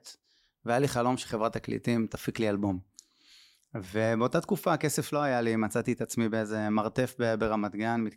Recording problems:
none

